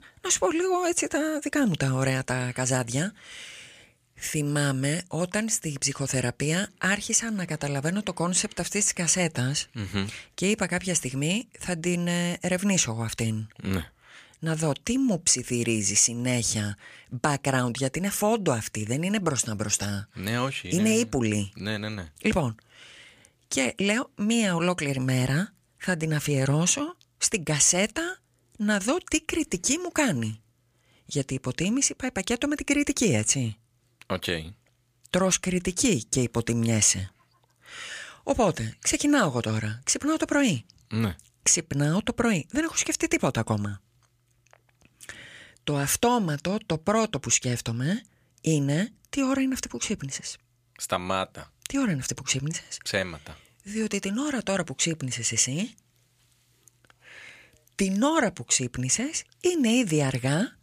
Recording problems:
none

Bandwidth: 15 kHz